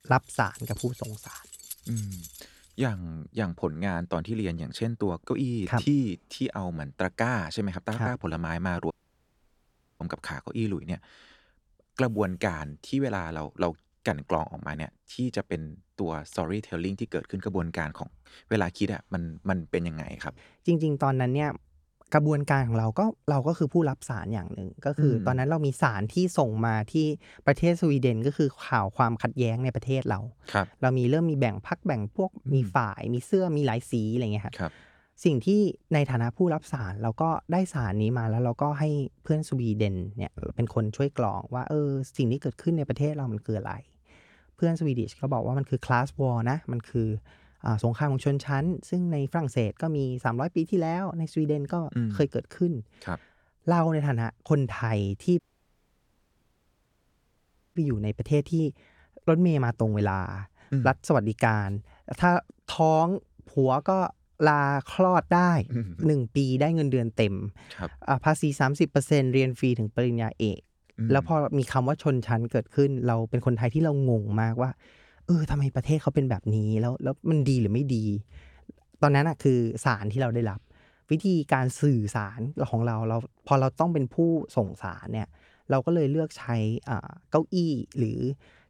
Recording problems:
jangling keys; faint; until 3 s; peak 15 dB below the speech
audio cutting out; at 9 s for 1 s and at 55 s for 2.5 s

